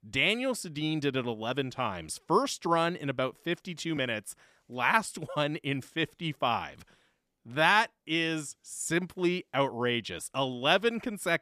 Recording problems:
none

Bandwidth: 14.5 kHz